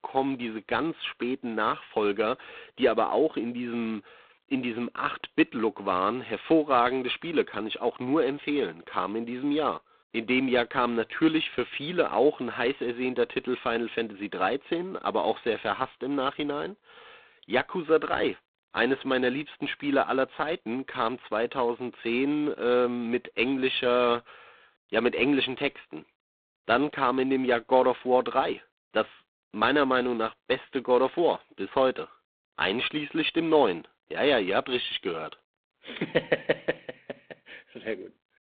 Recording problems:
phone-call audio; poor line; nothing above 3.5 kHz

